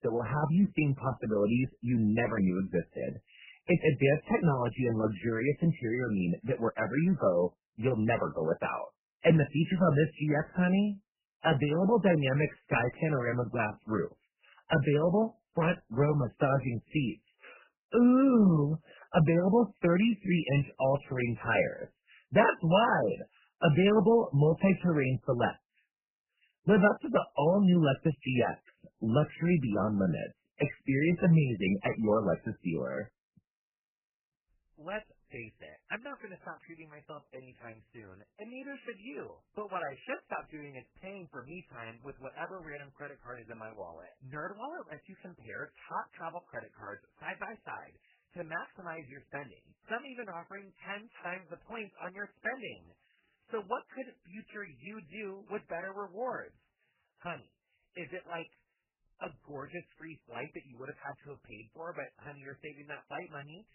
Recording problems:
garbled, watery; badly; nothing above 3 kHz

